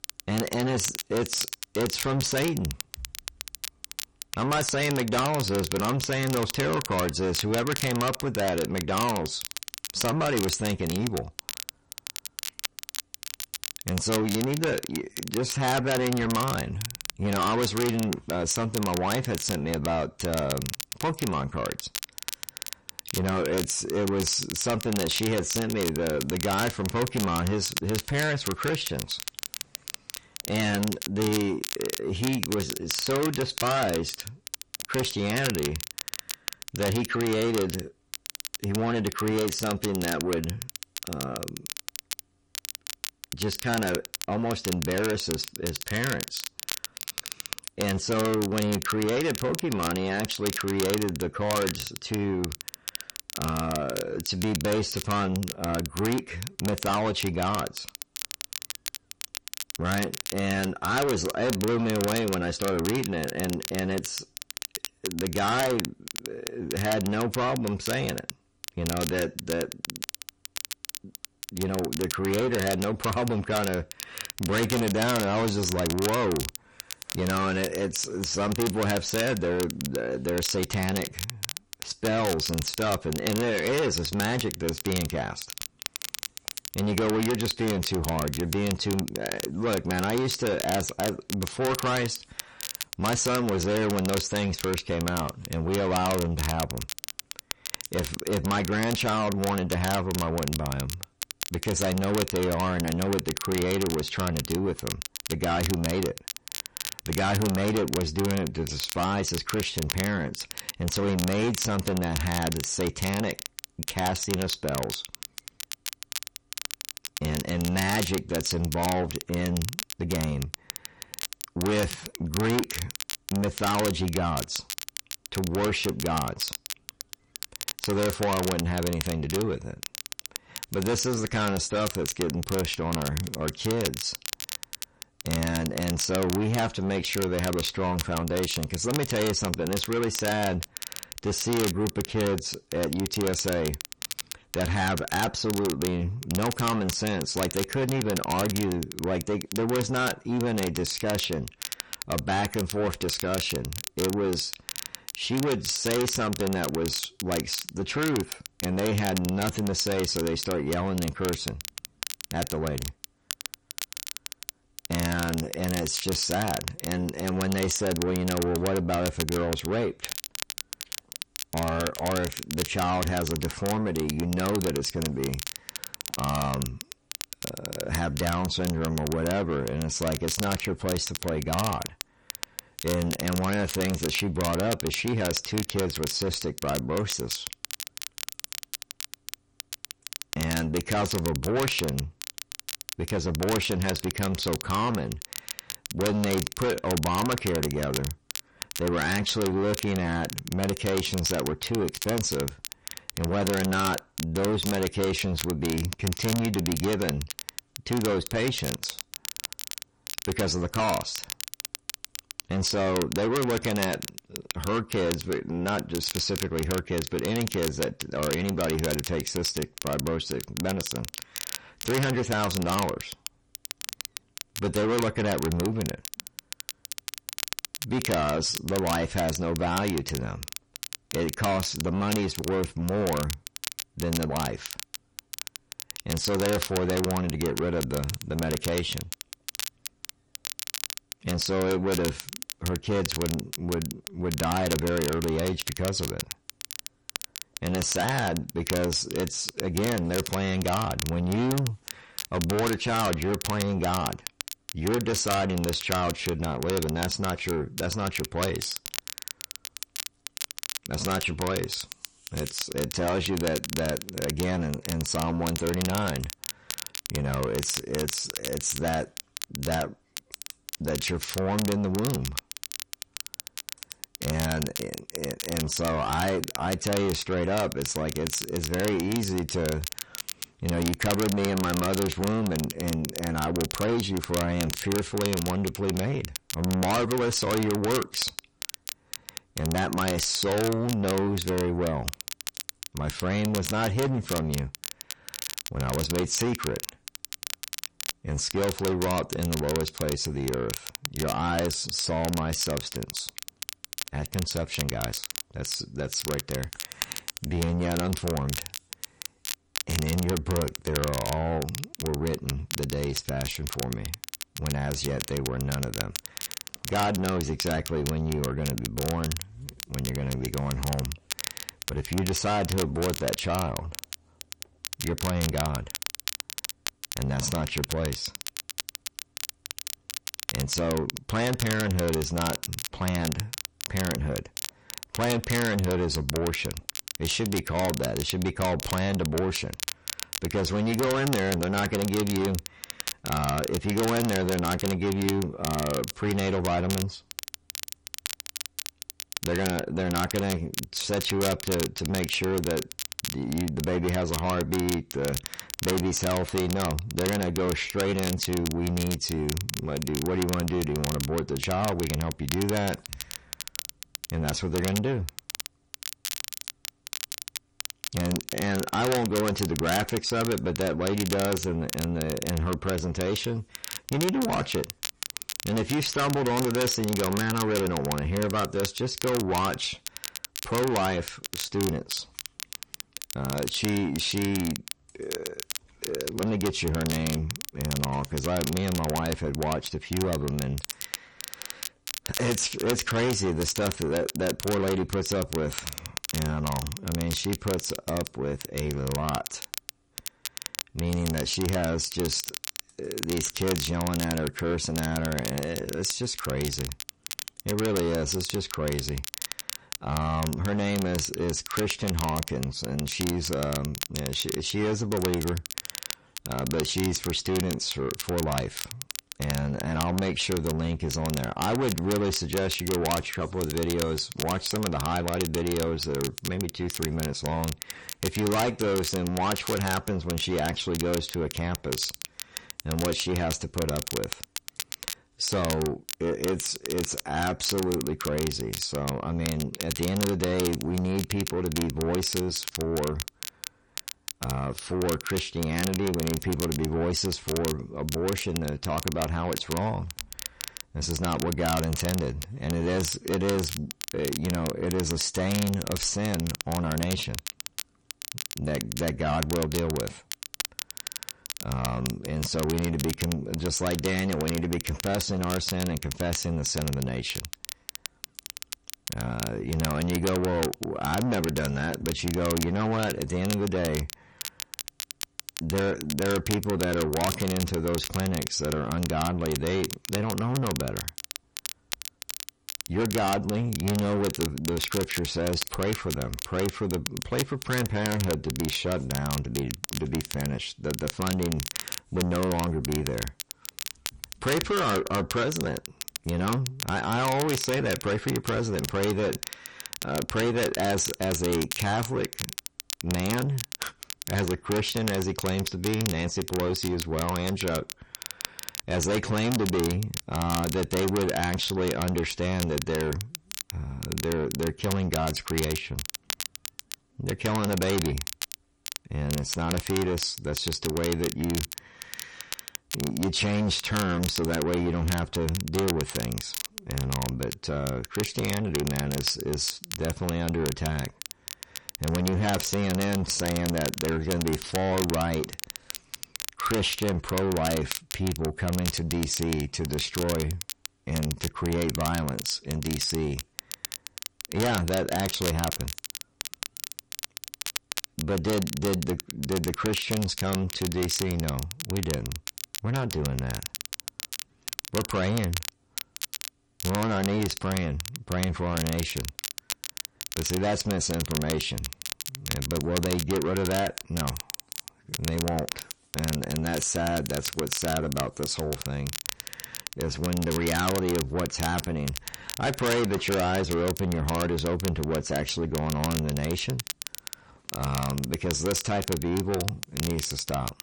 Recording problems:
distortion; heavy; 6 dB below the speech
garbled, watery; slightly; nothing above 9 kHz
crackle, like an old record; loud; 7 dB below the speech

